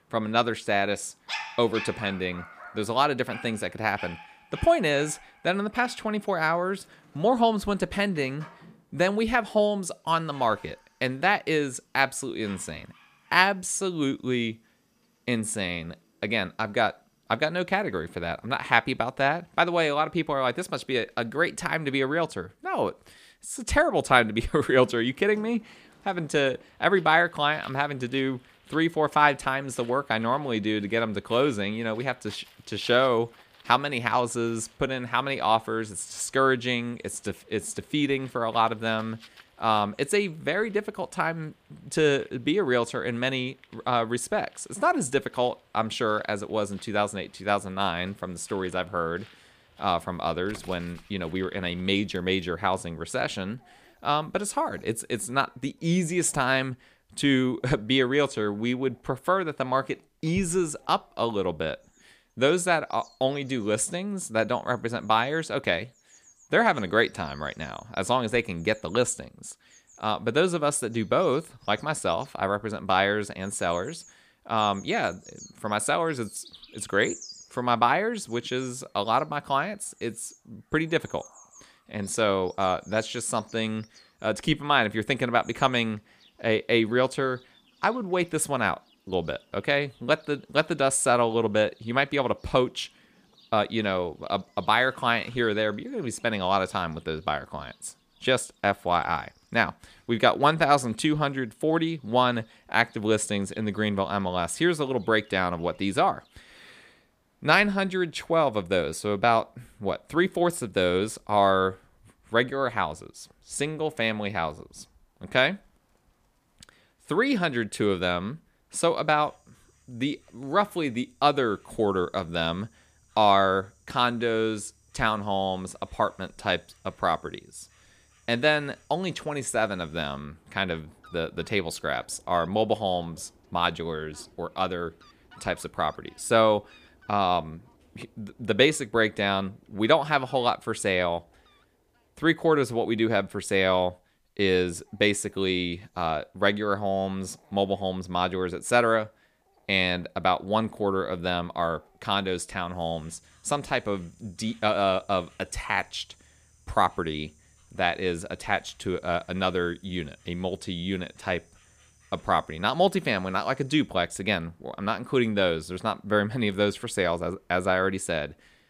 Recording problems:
animal sounds; faint; throughout; 25 dB below the speech

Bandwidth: 15 kHz